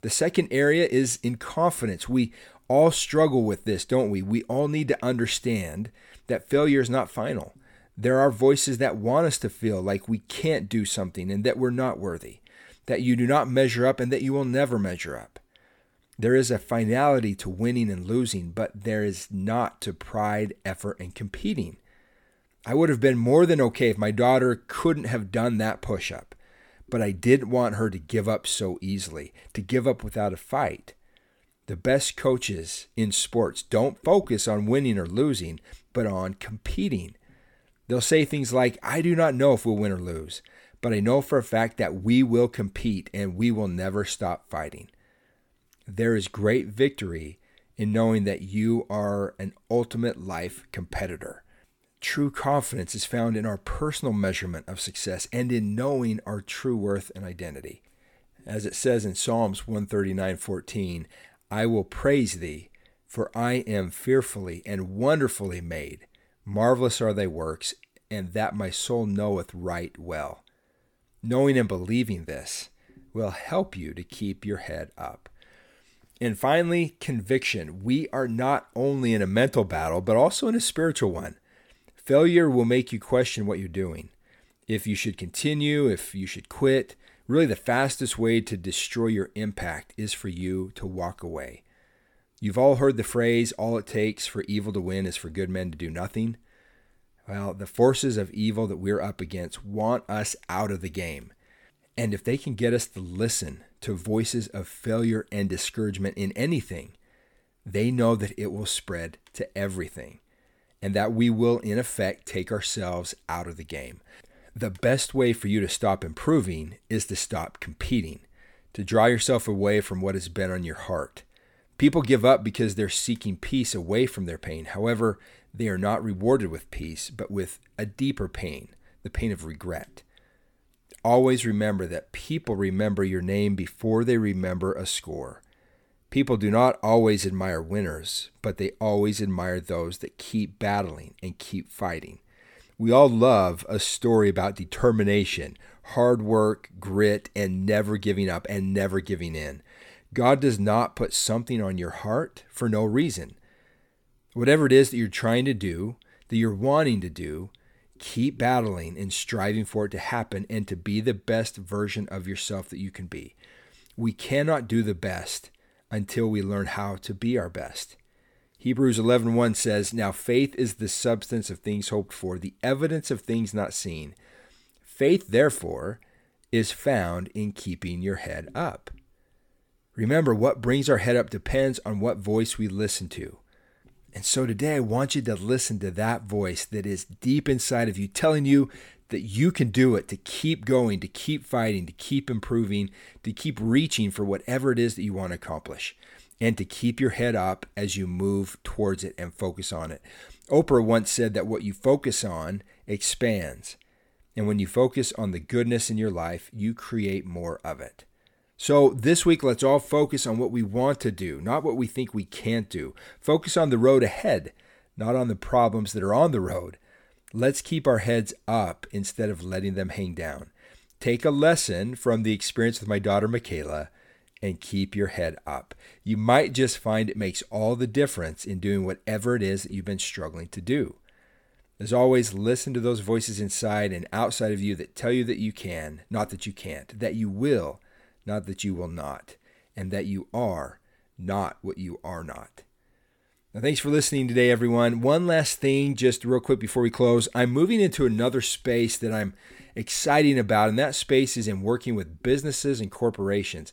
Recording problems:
none

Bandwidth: 18 kHz